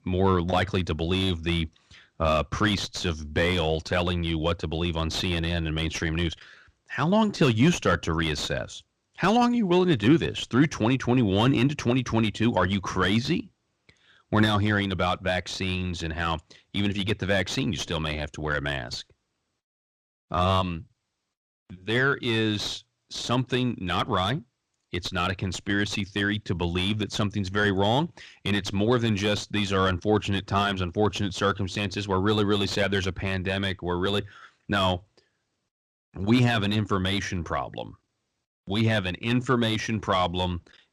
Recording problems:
distortion; slight; 10 dB below the speech

